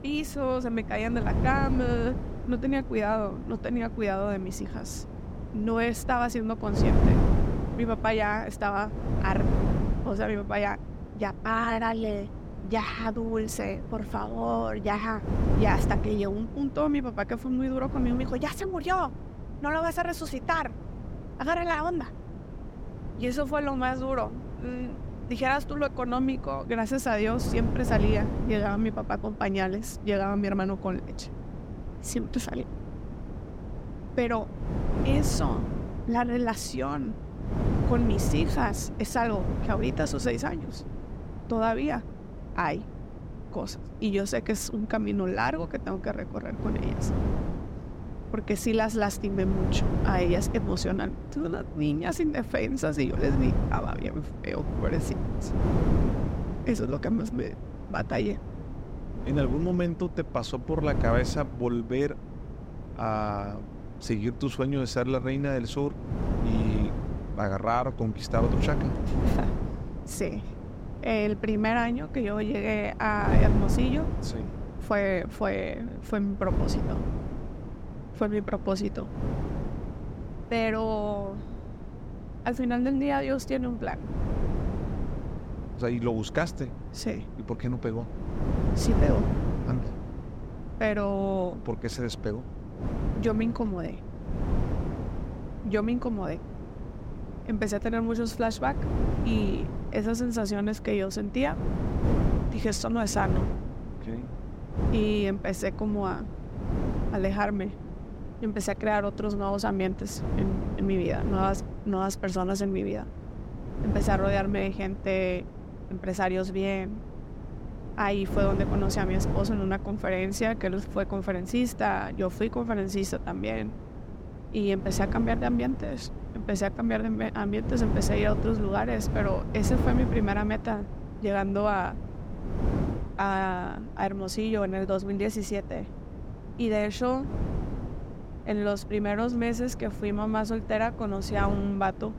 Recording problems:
wind noise on the microphone; occasional gusts; 10 dB below the speech

